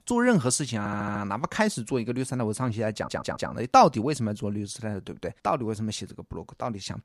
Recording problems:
audio stuttering; at 1 s and at 3 s

